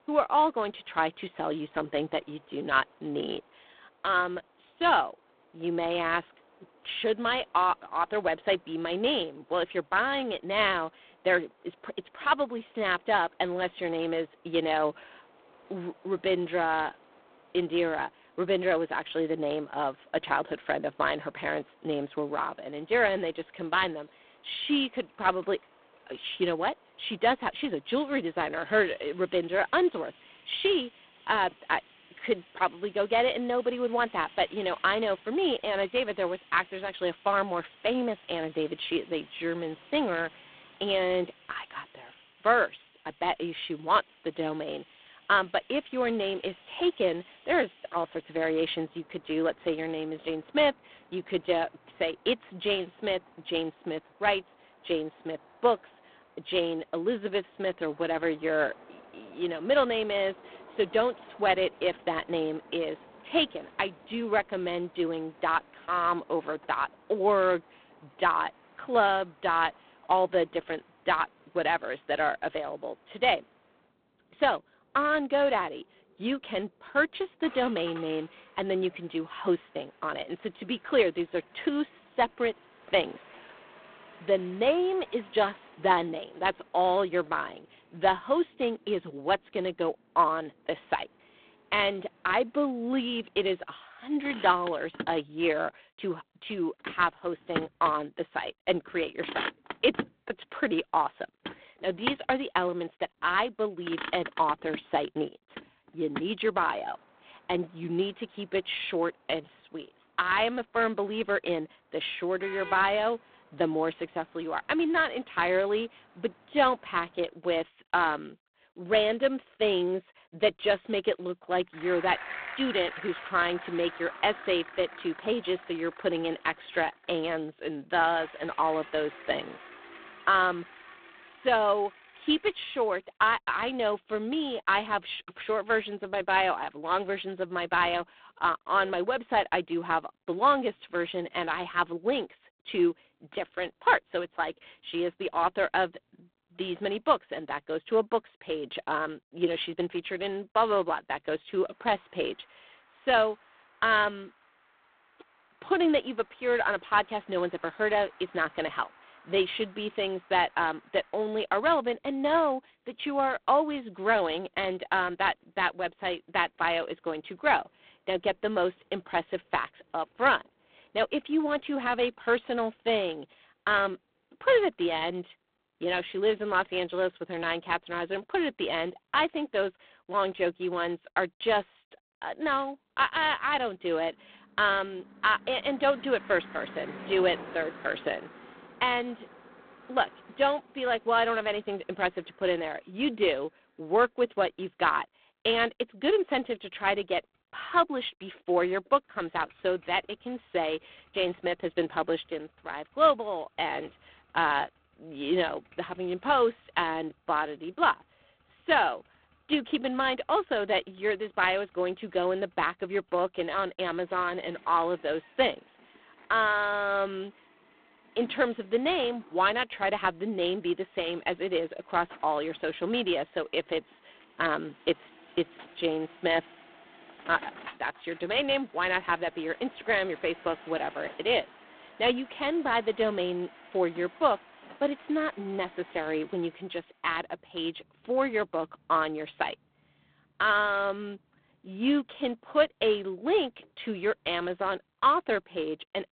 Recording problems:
phone-call audio; poor line
traffic noise; noticeable; throughout; 20 dB below the speech

